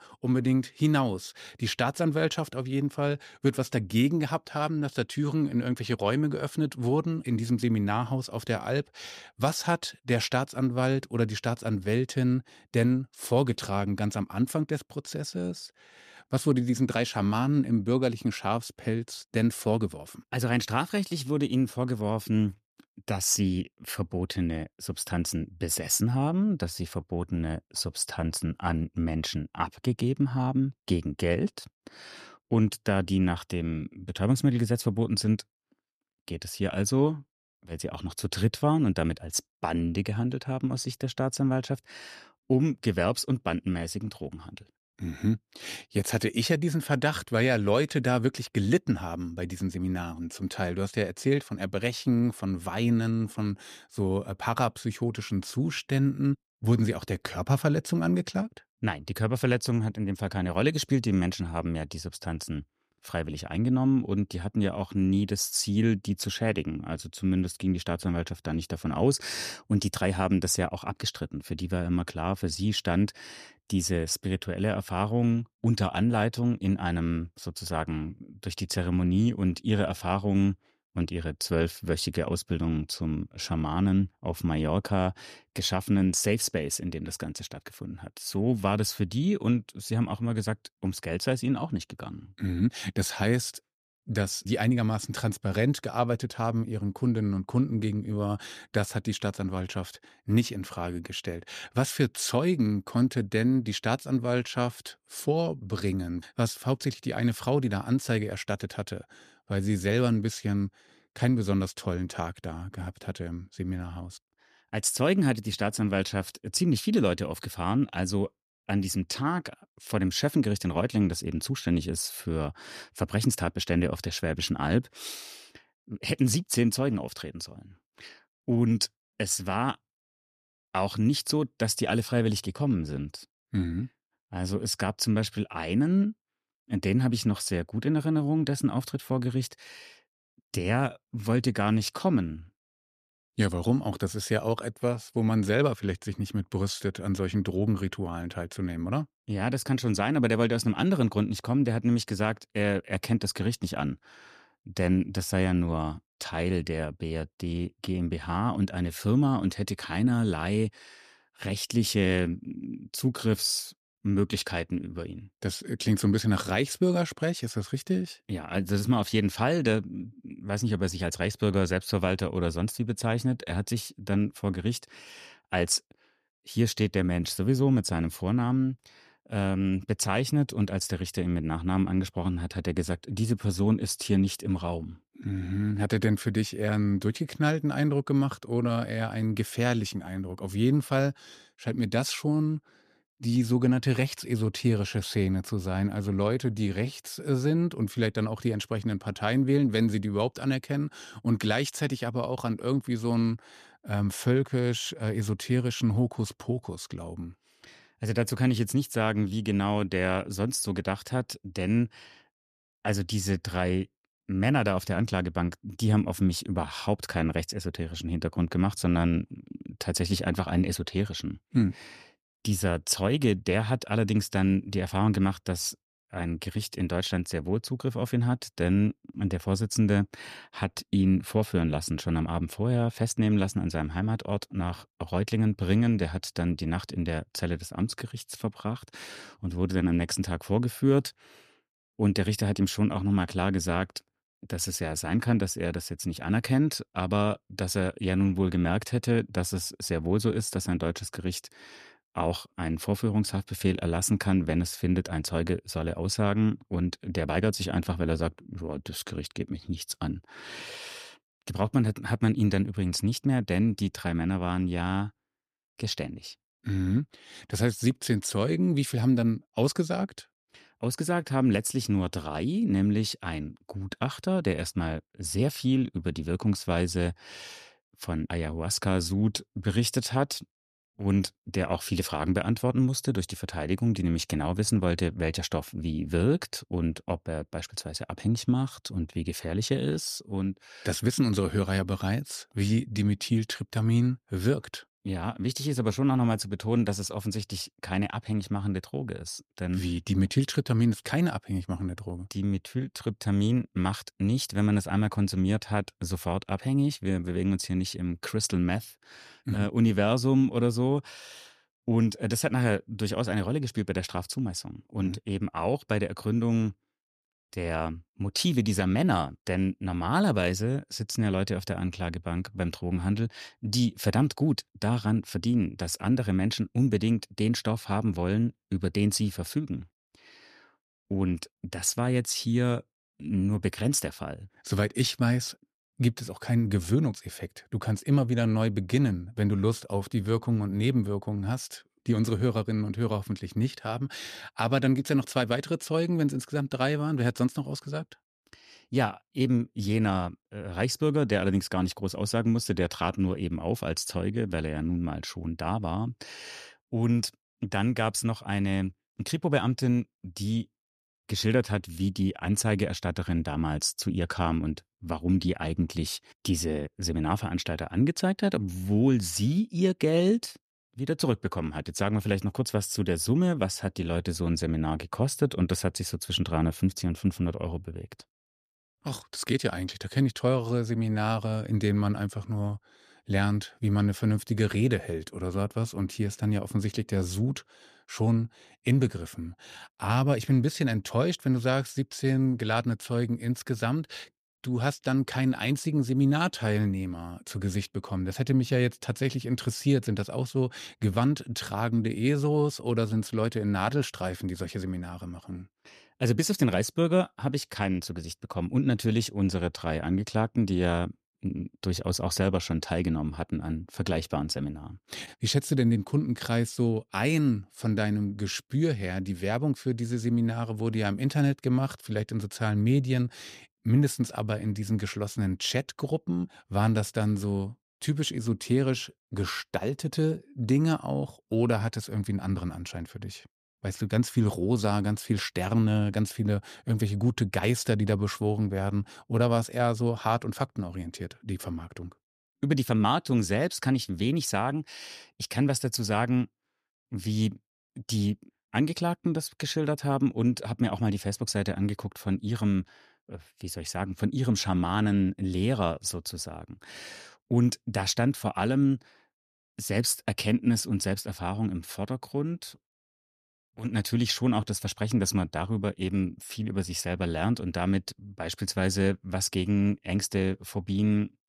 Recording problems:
none

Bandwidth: 14.5 kHz